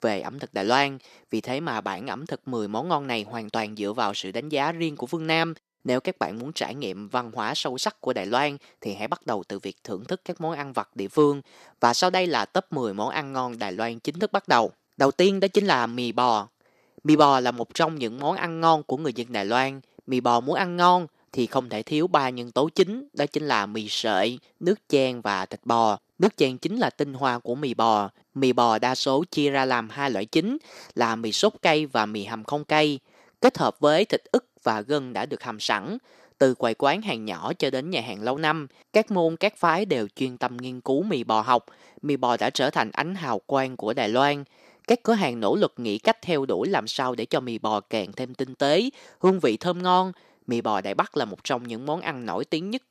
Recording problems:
thin; somewhat; fading below 400 Hz

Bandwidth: 14.5 kHz